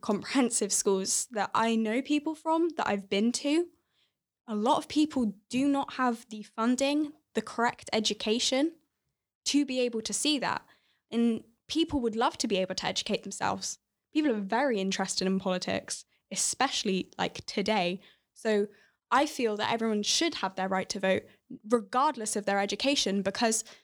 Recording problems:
none

